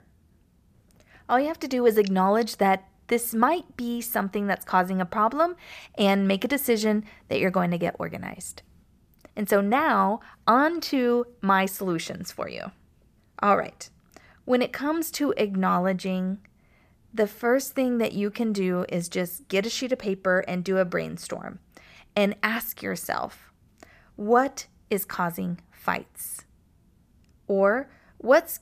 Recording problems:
none

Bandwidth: 14.5 kHz